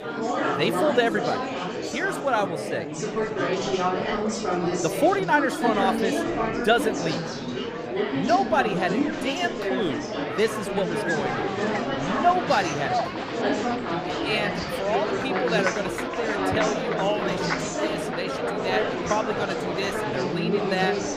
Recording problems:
murmuring crowd; very loud; throughout; as loud as the speech

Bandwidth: 15 kHz